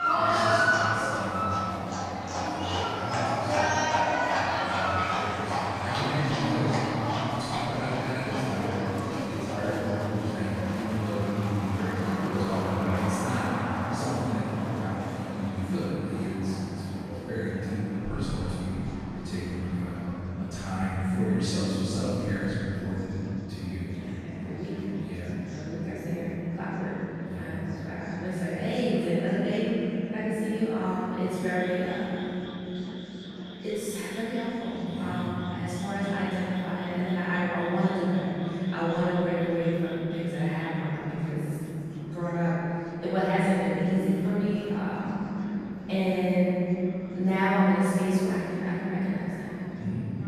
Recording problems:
room echo; strong; dies away in 3 s
off-mic speech; far
animal sounds; loud; throughout; 2 dB below the speech
murmuring crowd; noticeable; throughout; 15 dB below the speech

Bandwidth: 14.5 kHz